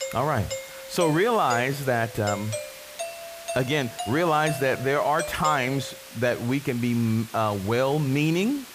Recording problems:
hiss; noticeable; throughout; 15 dB below the speech
doorbell; noticeable; until 6 s; peak 8 dB below the speech

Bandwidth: 15 kHz